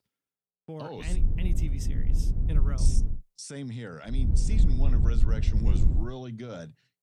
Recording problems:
low rumble; loud; from 1 to 3 s and from 4 to 6 s; 3 dB below the speech

